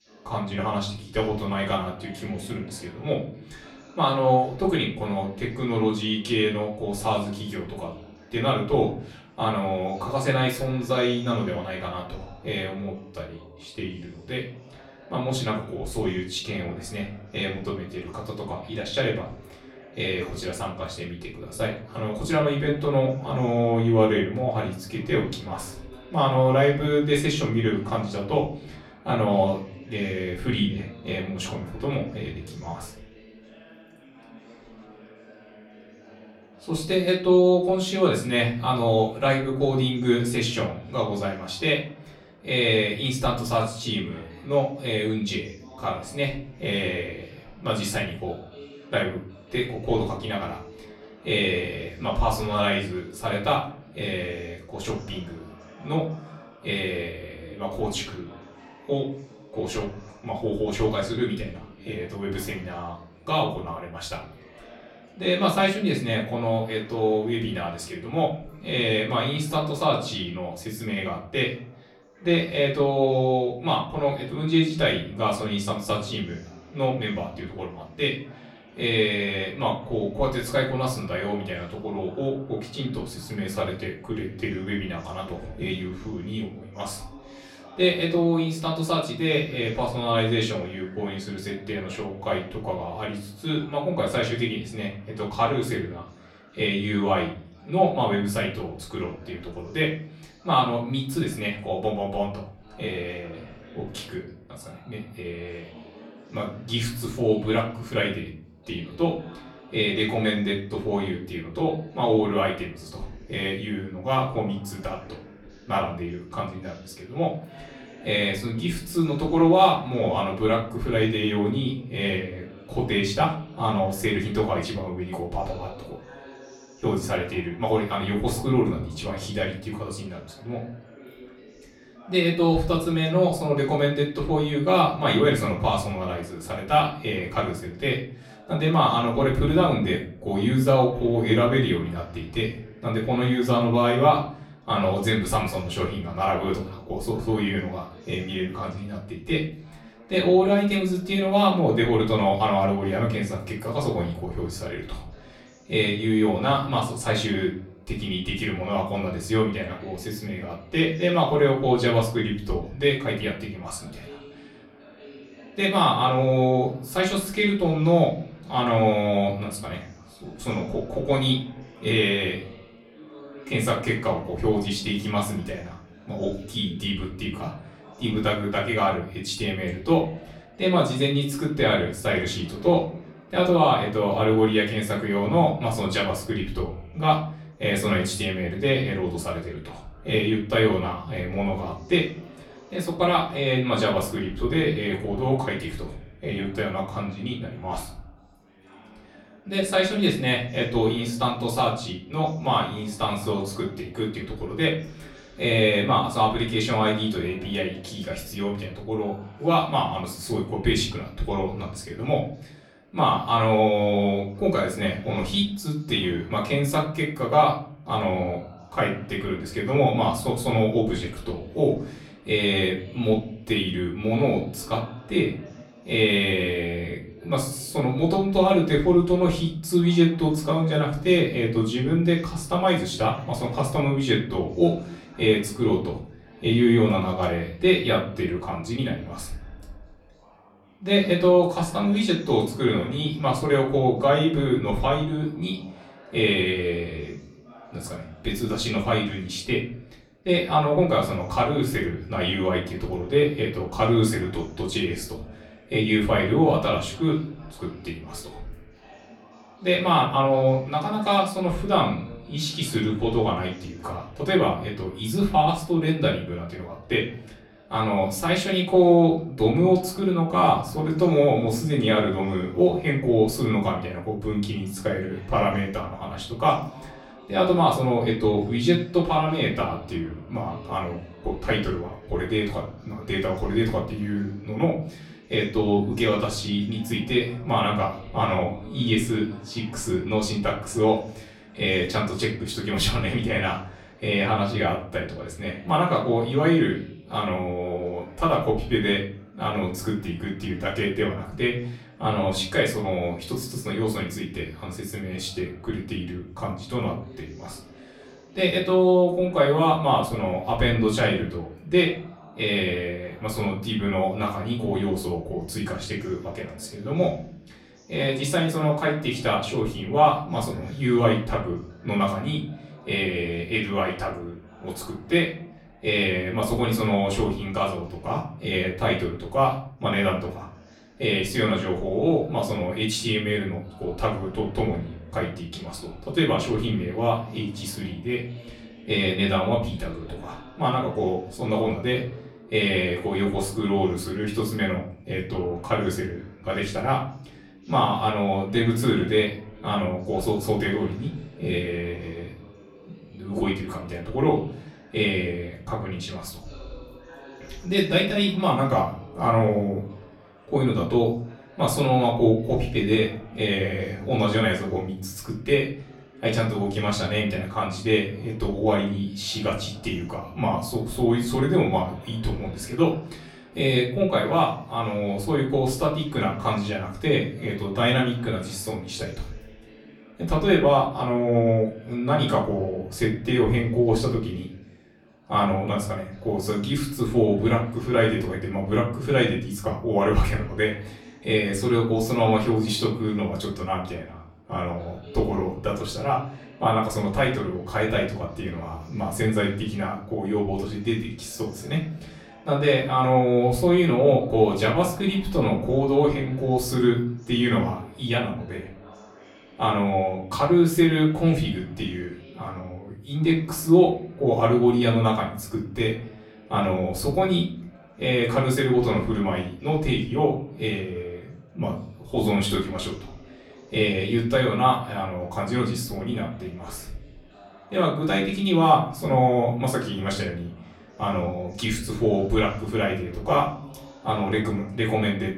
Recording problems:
off-mic speech; far
room echo; slight; dies away in 0.4 s
chatter from many people; faint; throughout; 25 dB below the speech

